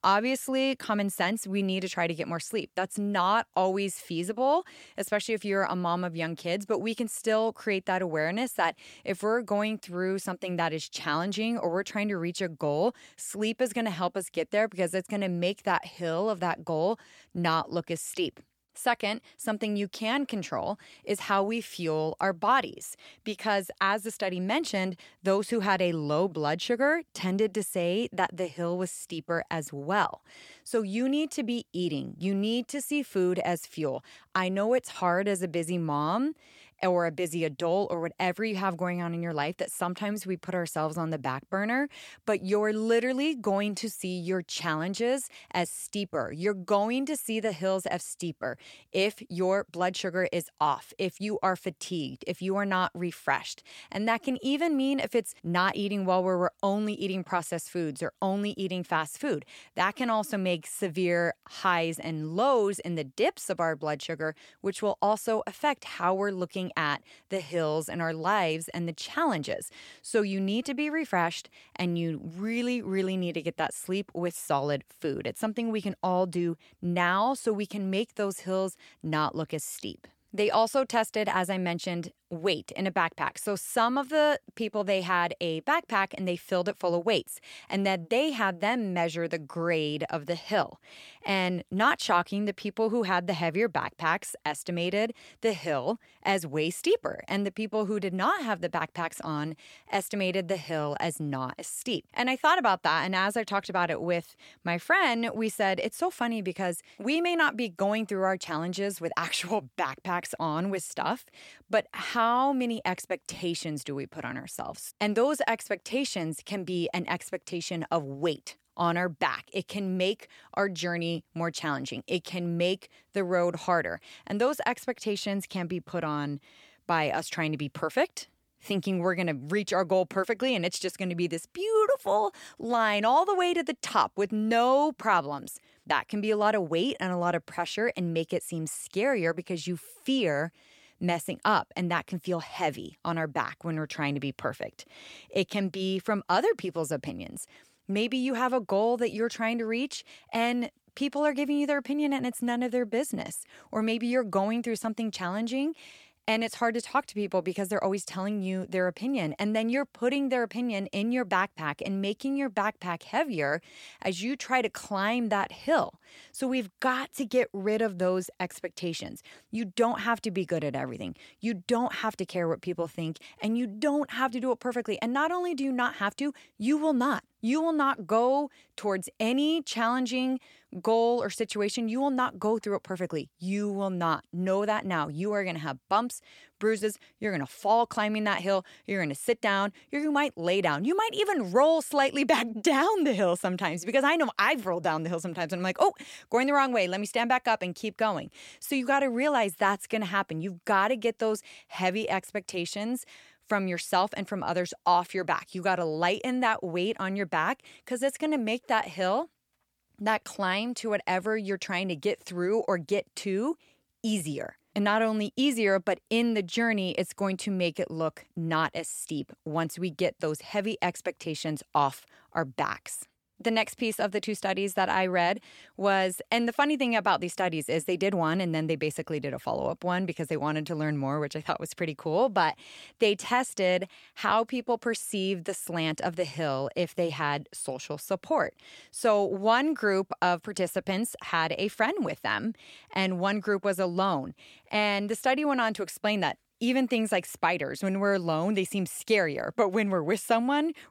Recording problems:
none

